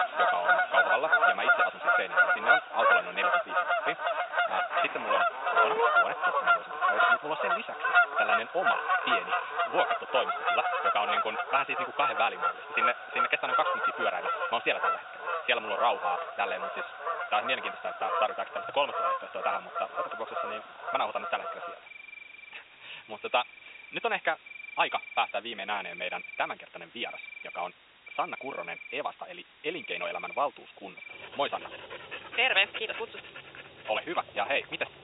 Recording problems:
thin; very; fading below 550 Hz
high frequencies cut off; severe; nothing above 4 kHz
wrong speed, natural pitch; too fast; 1.5 times normal speed
animal sounds; very loud; throughout; 4 dB above the speech
hiss; faint; throughout; 25 dB below the speech

